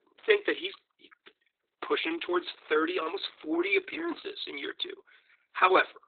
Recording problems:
garbled, watery; badly; nothing above 4 kHz
thin; very; fading below 300 Hz

